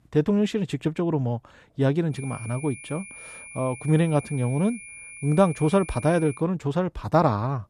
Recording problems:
high-pitched whine; noticeable; from 2 to 6.5 s; 2.5 kHz, 15 dB below the speech

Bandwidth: 14 kHz